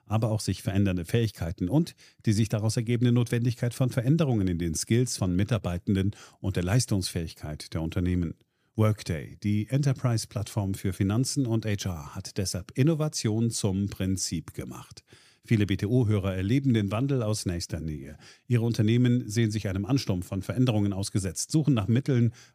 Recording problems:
none

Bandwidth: 15 kHz